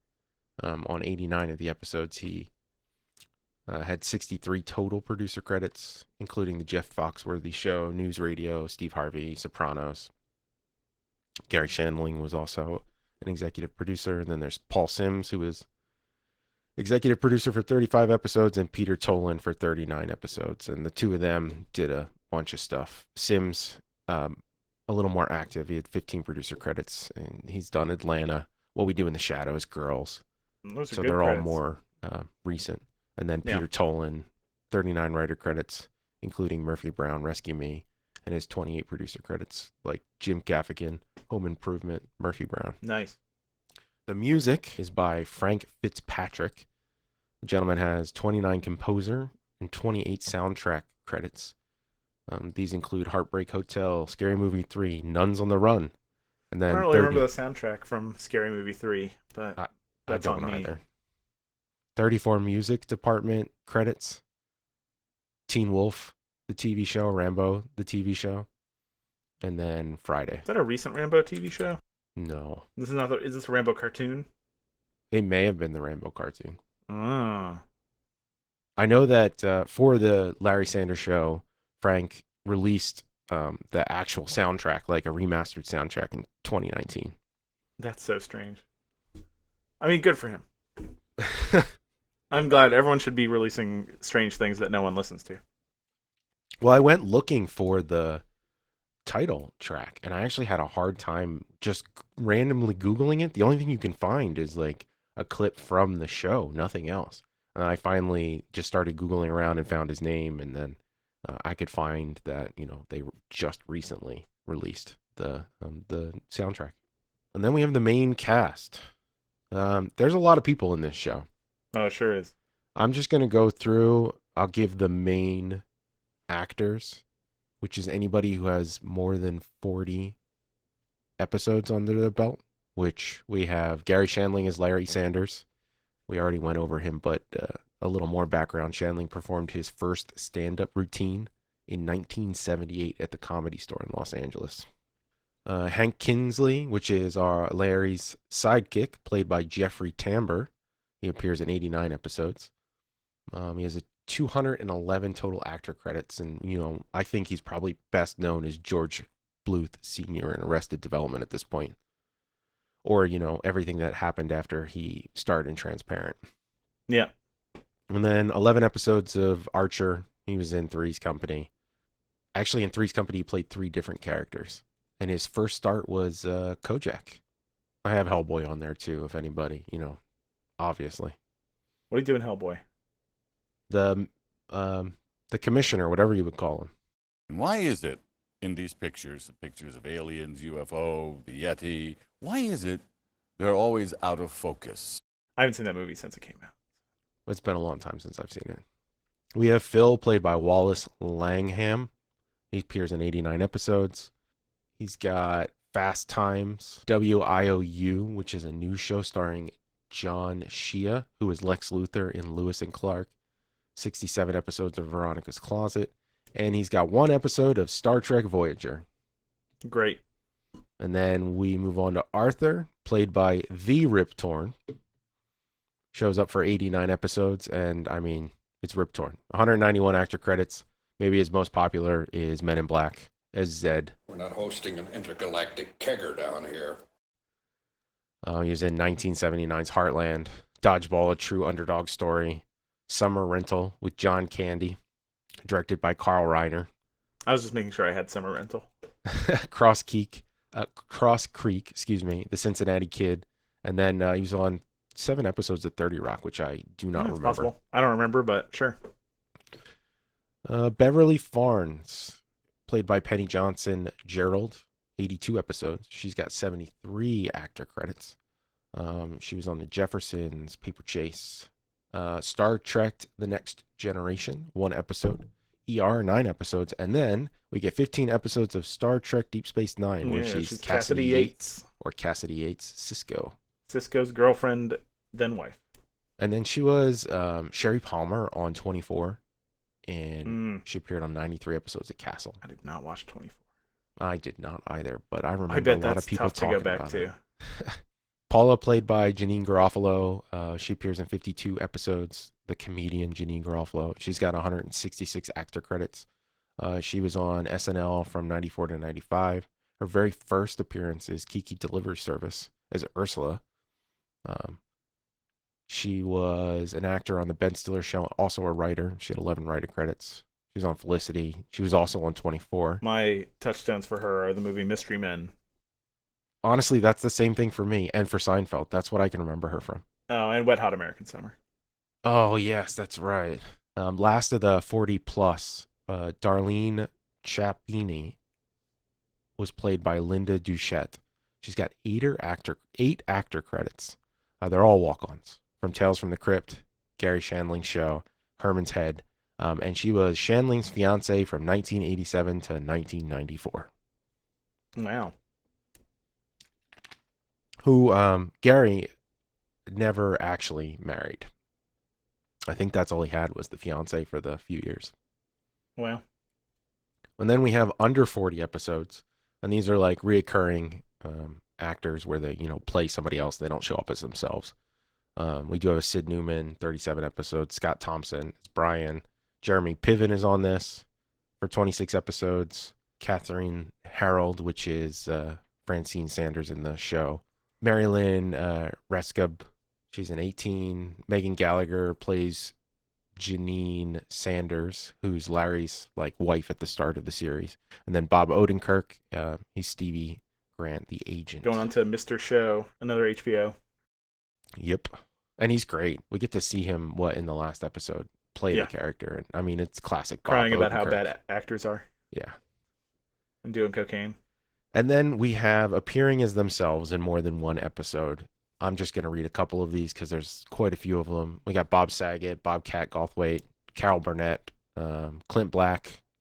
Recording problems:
garbled, watery; slightly

